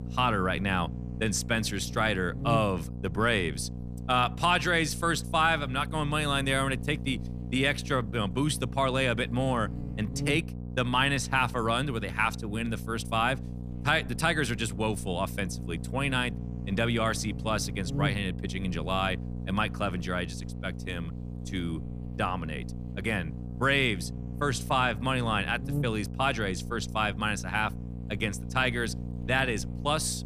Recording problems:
electrical hum; noticeable; throughout; 60 Hz, 20 dB below the speech

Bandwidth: 14.5 kHz